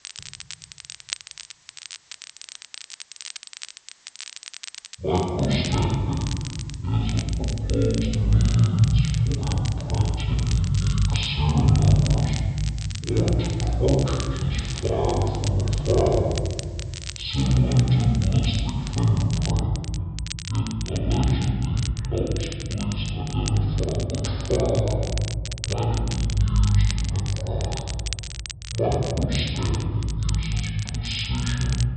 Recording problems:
off-mic speech; far
wrong speed and pitch; too slow and too low; 0.6 times normal speed
room echo; noticeable; dies away in 1.8 s
high frequencies cut off; noticeable; nothing above 5.5 kHz
crackle, like an old record; noticeable; 15 dB below the speech
hiss; faint; until 19 s; 30 dB below the speech

